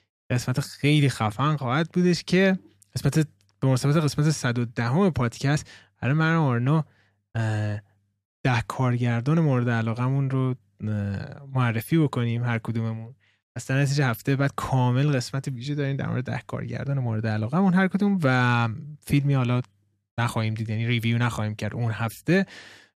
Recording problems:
none

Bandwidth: 14.5 kHz